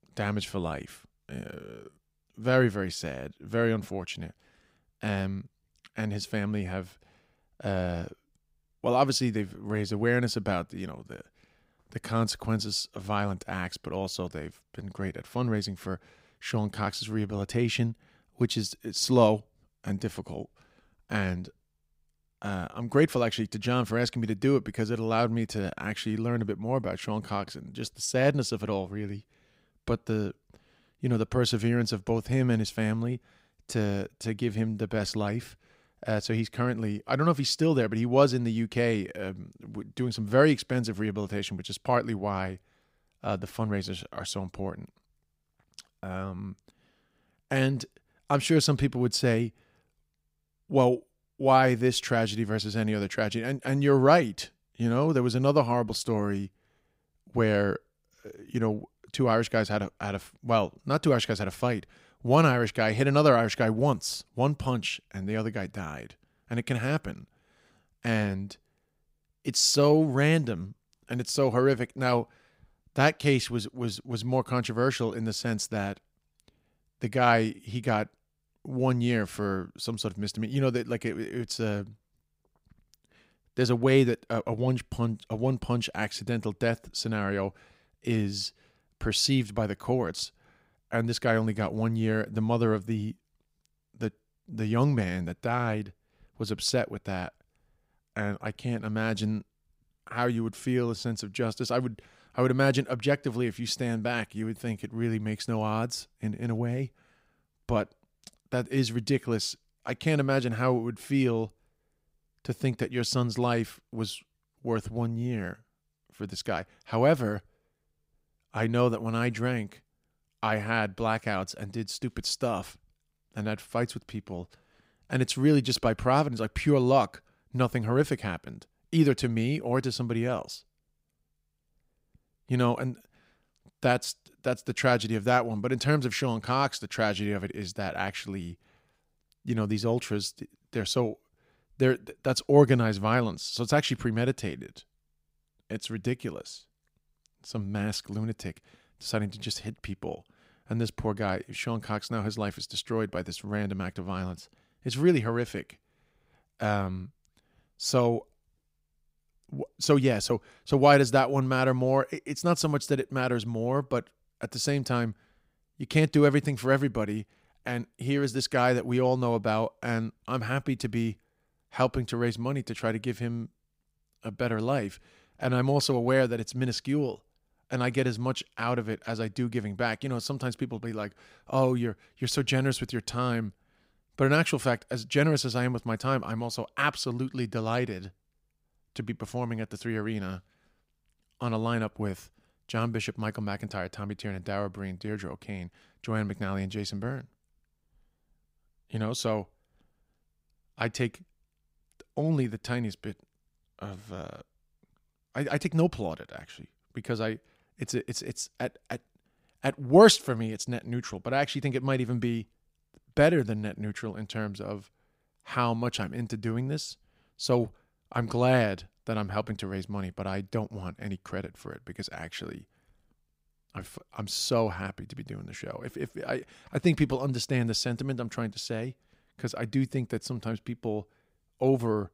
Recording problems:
none

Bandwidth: 15.5 kHz